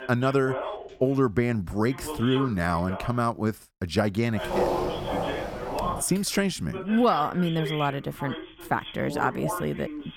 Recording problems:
voice in the background; loud; throughout; 9 dB below the speech
footsteps; loud; from 4.5 to 6 s; peak 1 dB above the speech

